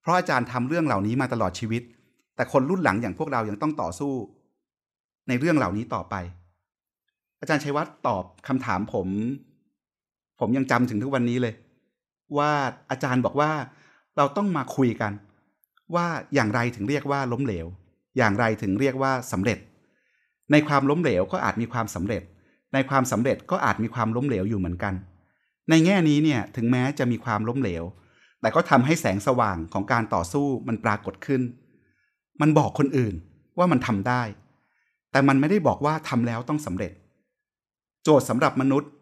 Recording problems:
none

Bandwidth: 14 kHz